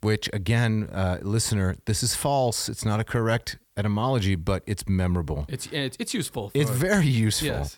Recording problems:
none

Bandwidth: 18 kHz